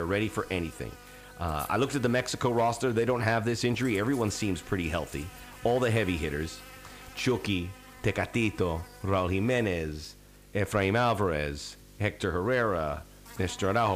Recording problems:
electrical hum; noticeable; throughout; 50 Hz, 20 dB below the speech
abrupt cut into speech; at the start and the end

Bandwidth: 15 kHz